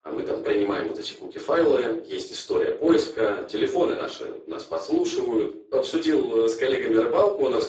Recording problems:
off-mic speech; far
garbled, watery; badly; nothing above 7.5 kHz
thin; very; fading below 300 Hz
room echo; slight; dies away in 0.4 s

